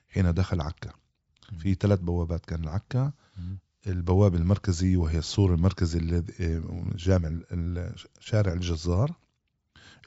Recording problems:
high frequencies cut off; noticeable; nothing above 8 kHz

